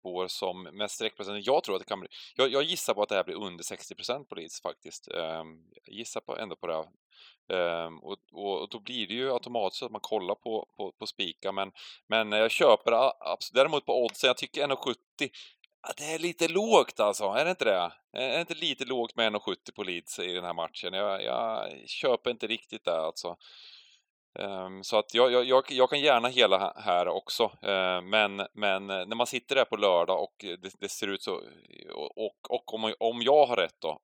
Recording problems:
thin; somewhat; fading below 400 Hz

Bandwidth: 18 kHz